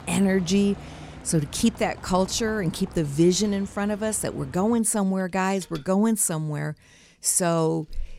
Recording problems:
traffic noise; noticeable; throughout; 20 dB below the speech

